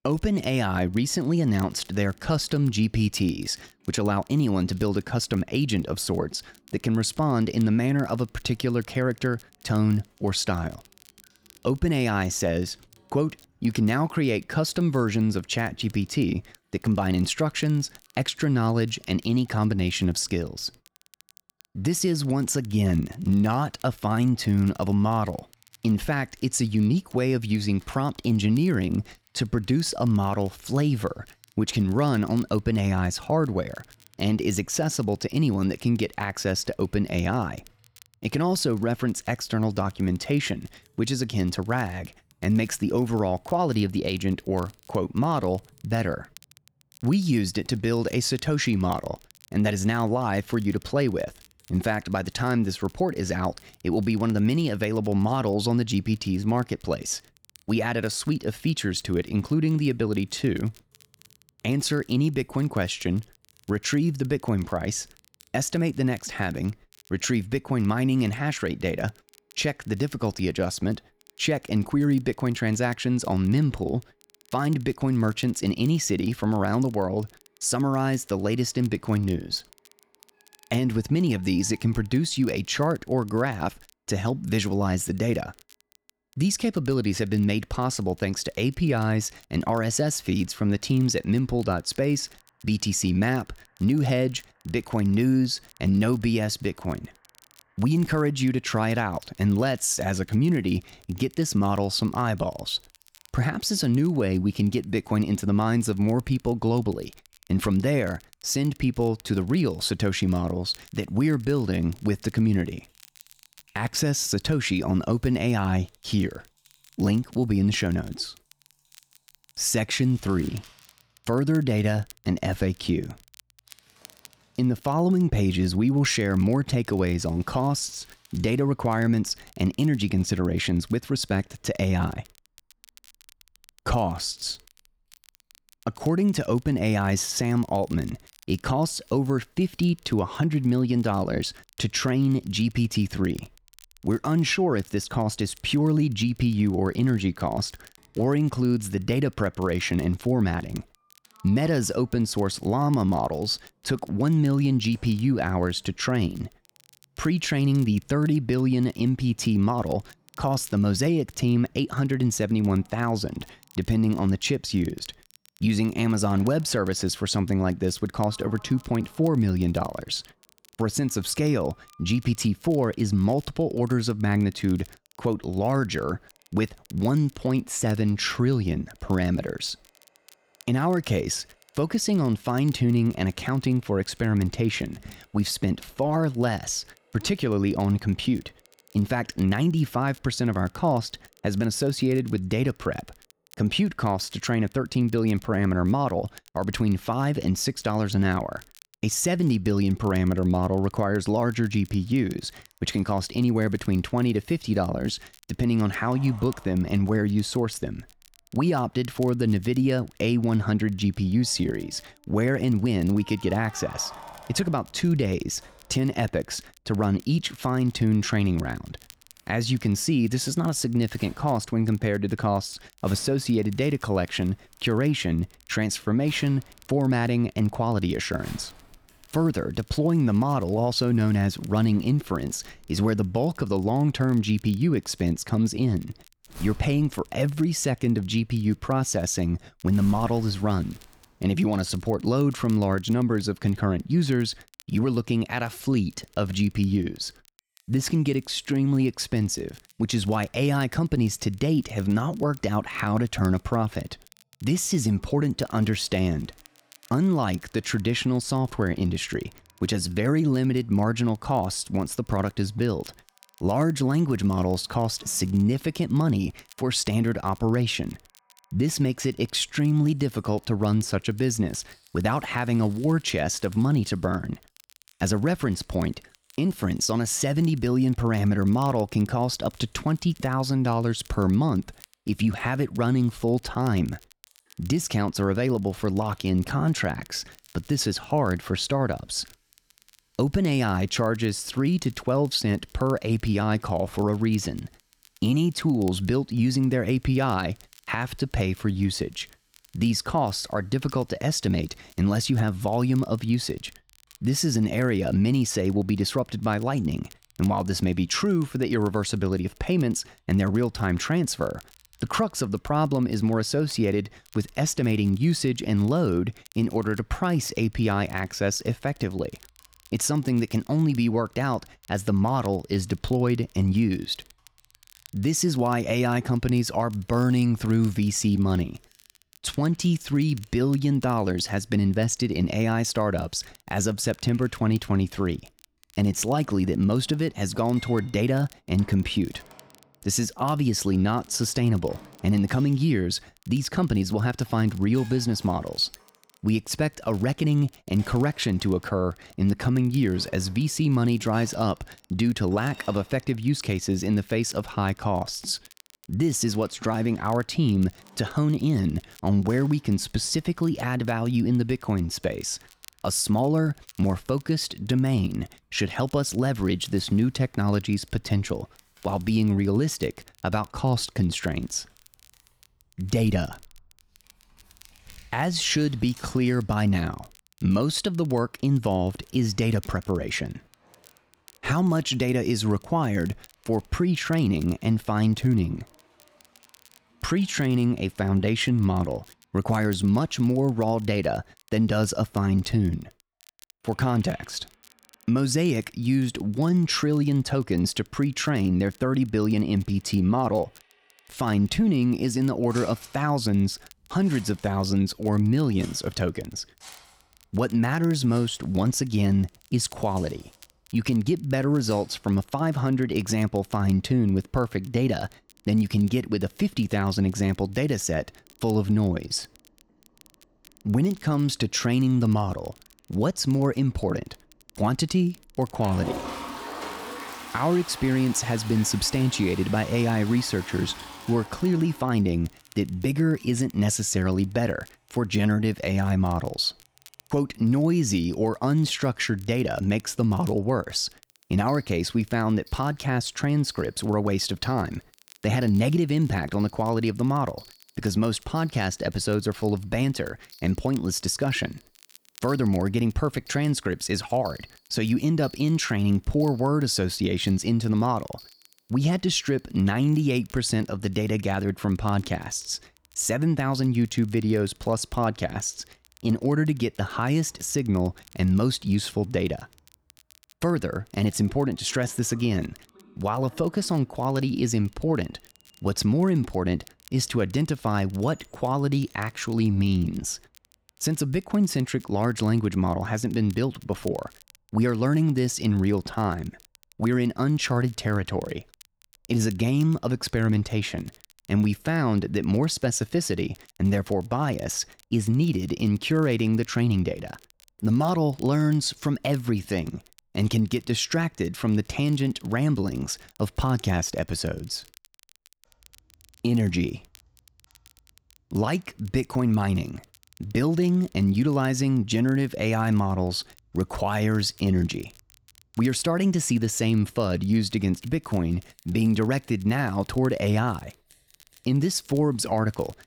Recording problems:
household noises; faint; throughout; 25 dB below the speech
crackle, like an old record; faint; 30 dB below the speech

